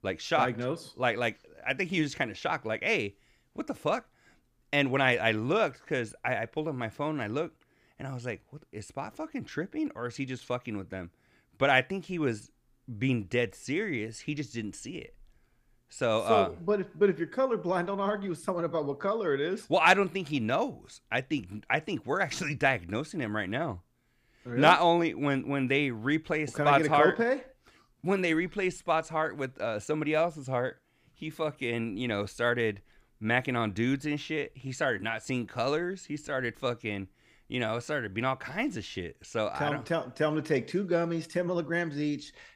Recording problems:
none

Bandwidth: 15 kHz